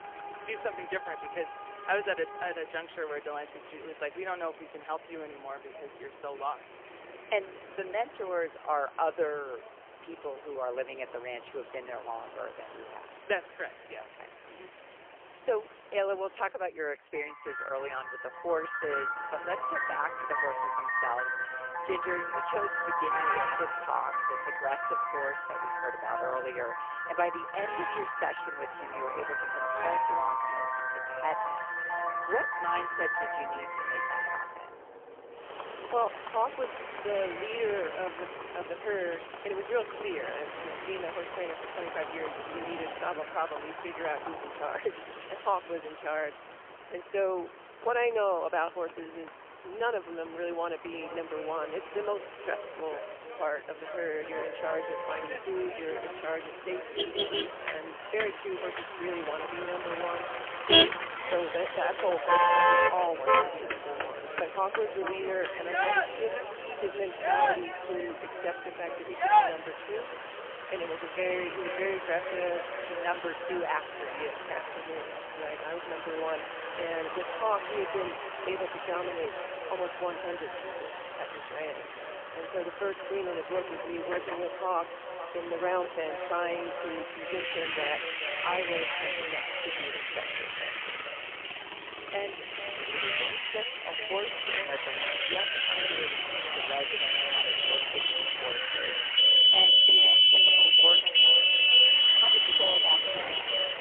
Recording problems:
phone-call audio; poor line; nothing above 3 kHz
echo of what is said; strong; from 51 s on; 440 ms later, 8 dB below the speech
thin; very; fading below 300 Hz
traffic noise; very loud; throughout; 10 dB above the speech

